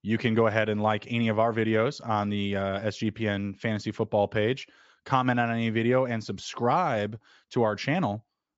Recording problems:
high frequencies cut off; noticeable; nothing above 8 kHz

